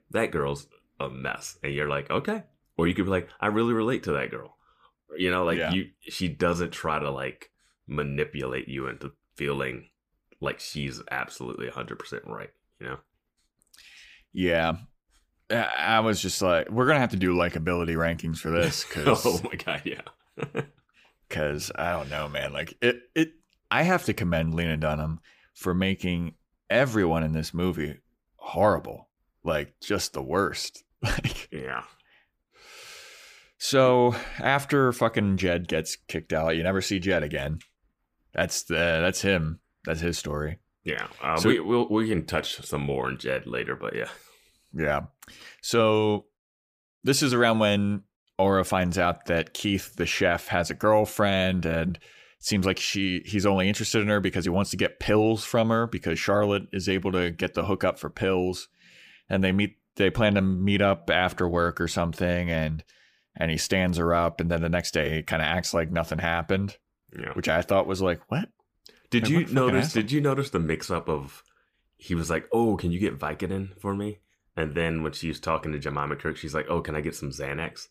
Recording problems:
none

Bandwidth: 15 kHz